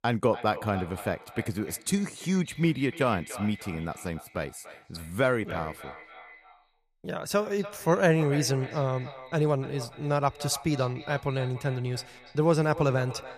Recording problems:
echo of what is said; noticeable; throughout; 290 ms later, 15 dB below the speech

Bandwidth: 14.5 kHz